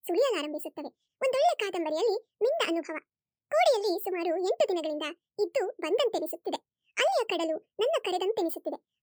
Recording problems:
wrong speed and pitch; too fast and too high; 1.5 times normal speed

